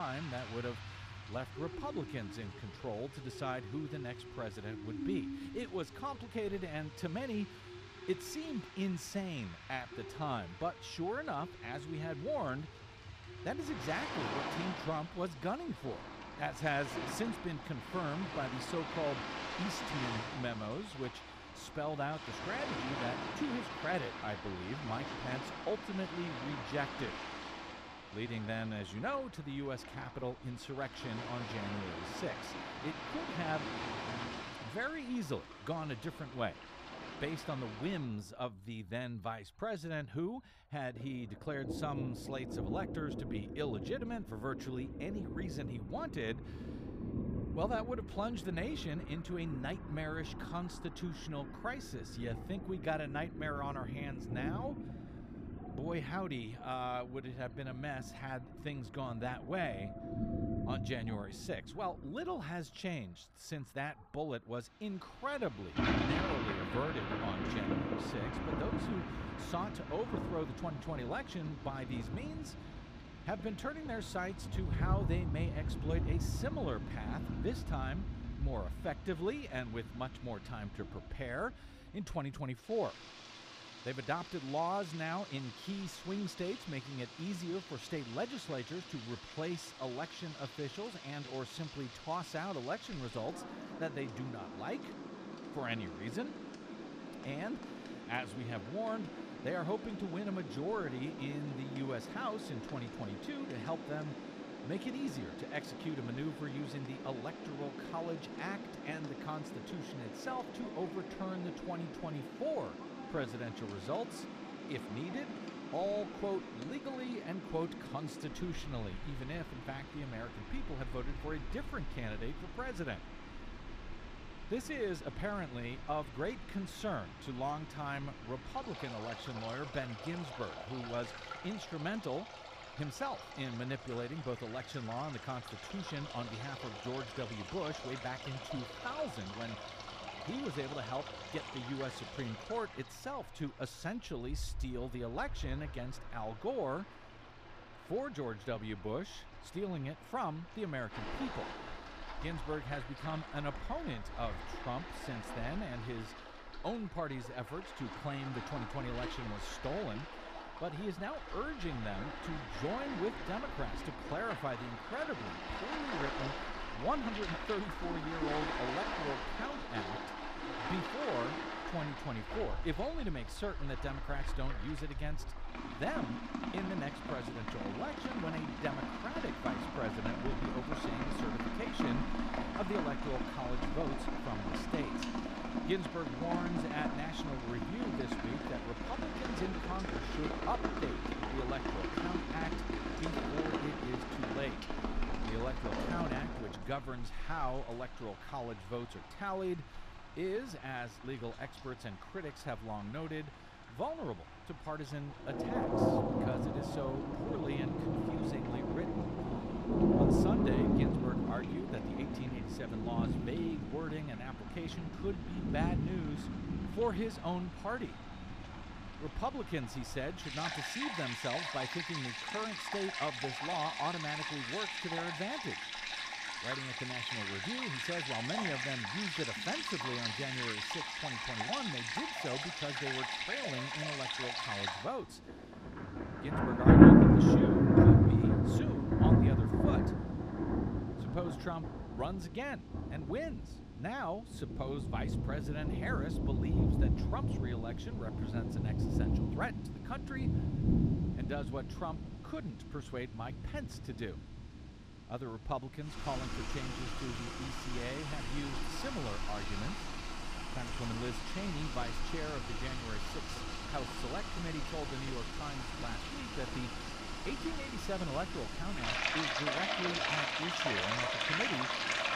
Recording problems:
rain or running water; very loud; throughout; 5 dB above the speech
abrupt cut into speech; at the start

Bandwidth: 14.5 kHz